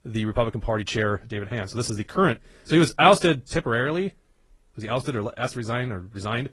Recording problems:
wrong speed, natural pitch; too fast; 1.5 times normal speed
garbled, watery; slightly

